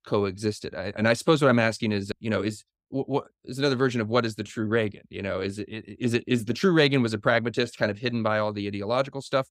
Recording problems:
none

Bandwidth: 15.5 kHz